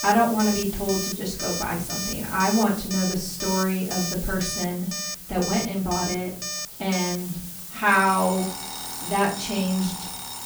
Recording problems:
off-mic speech; far
room echo; slight; dies away in 0.5 s
alarms or sirens; loud; throughout; 6 dB below the speech
hiss; loud; throughout; 10 dB below the speech
murmuring crowd; faint; throughout; 30 dB below the speech

